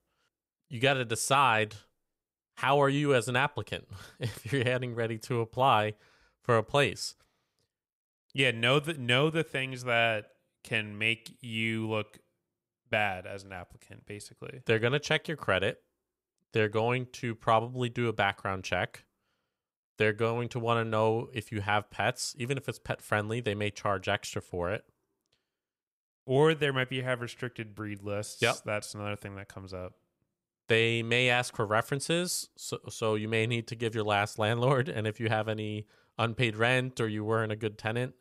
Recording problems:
none

